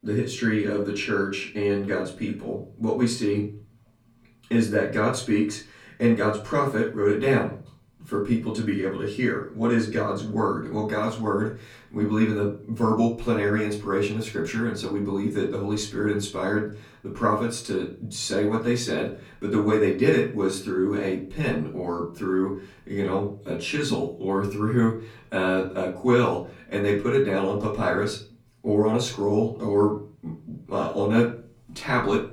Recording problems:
off-mic speech; far
room echo; slight; dies away in 0.4 s

